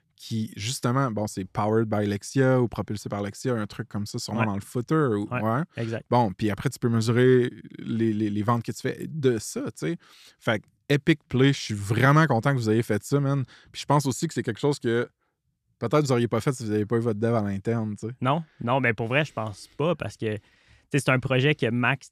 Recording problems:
none

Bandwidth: 14 kHz